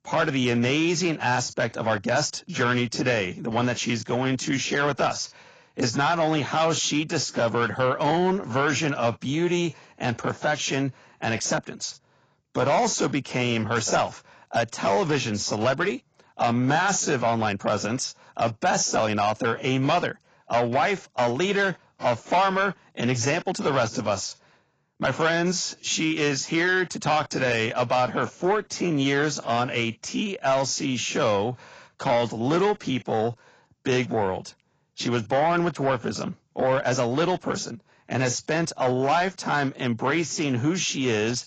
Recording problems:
garbled, watery; badly; nothing above 7.5 kHz
distortion; slight; 10 dB below the speech

